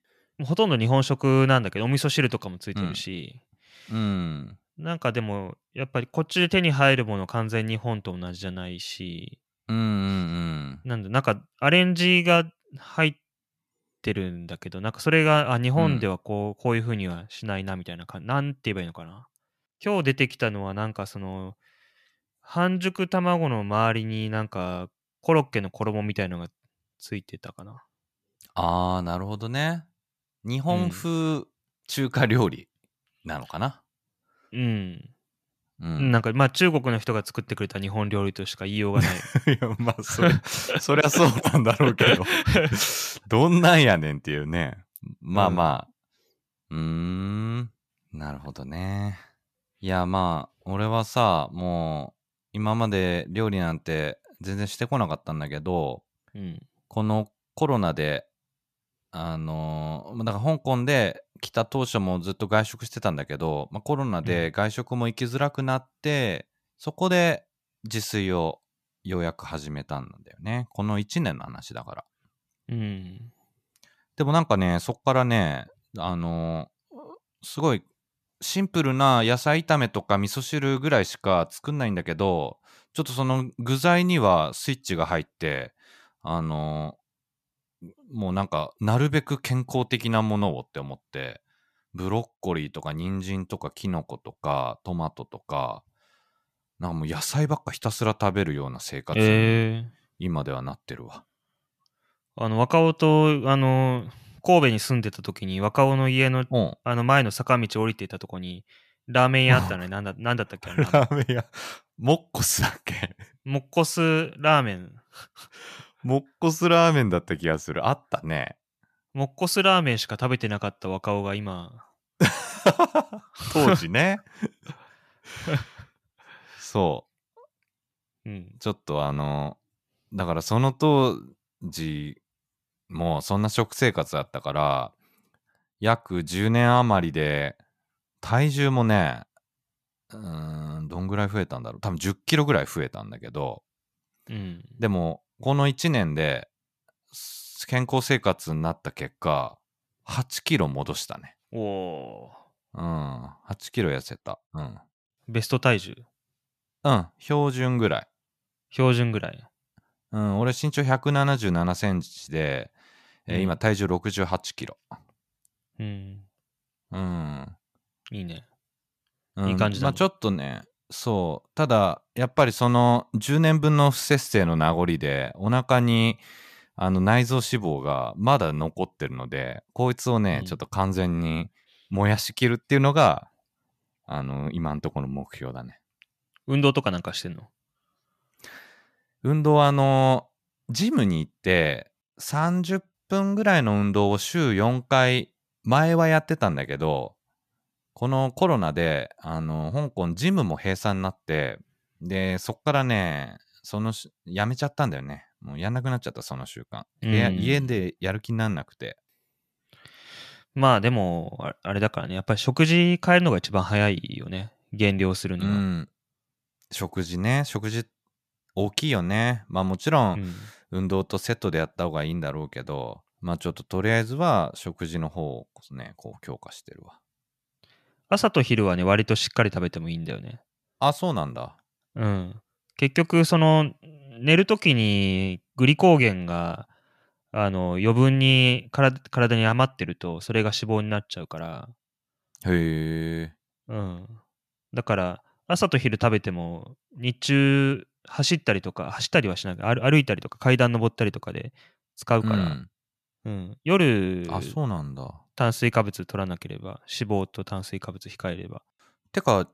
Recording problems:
none

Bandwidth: 14.5 kHz